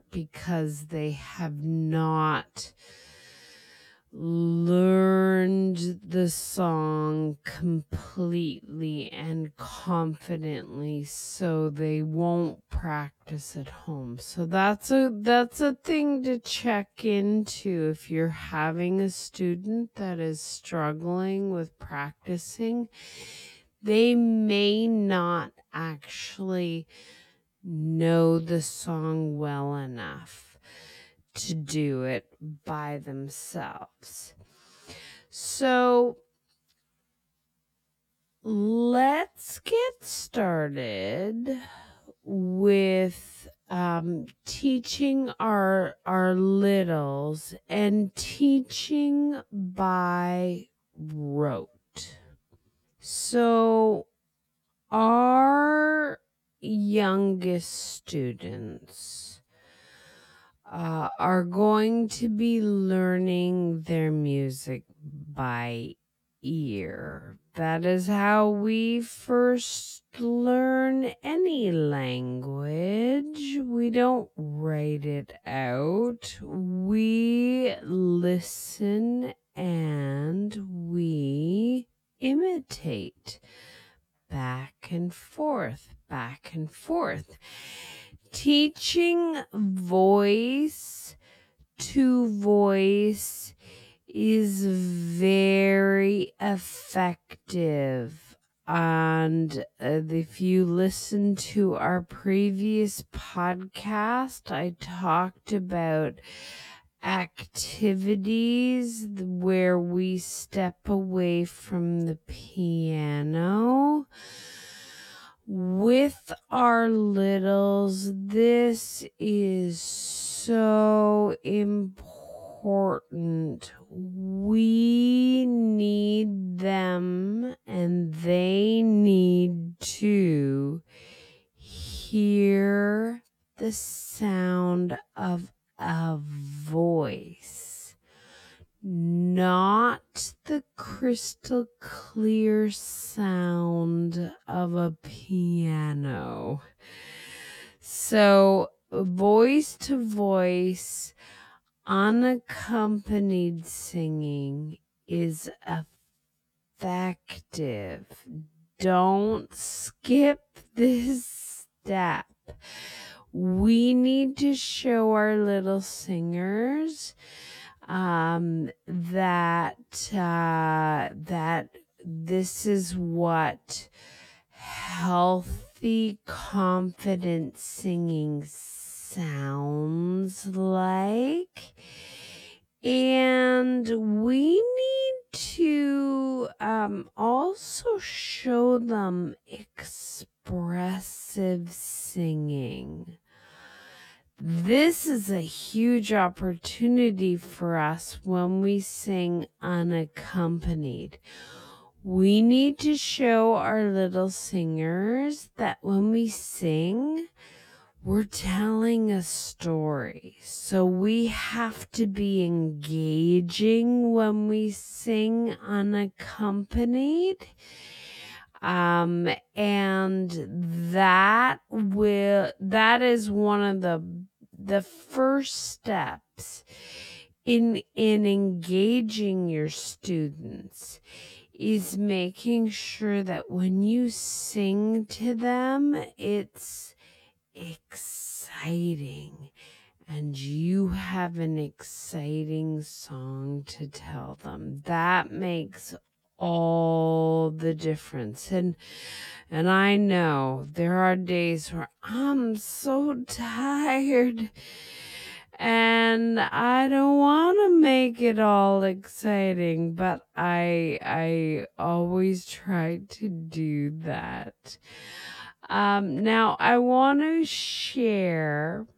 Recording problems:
wrong speed, natural pitch; too slow; 0.5 times normal speed

